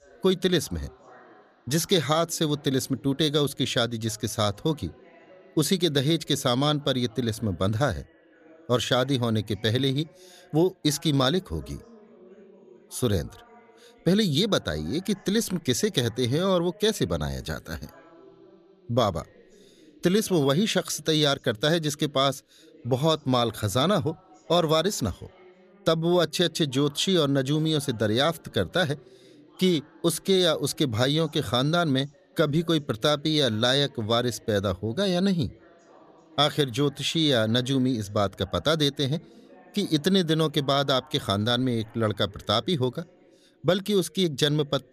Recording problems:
background chatter; faint; throughout; 2 voices, 30 dB below the speech

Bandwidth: 14.5 kHz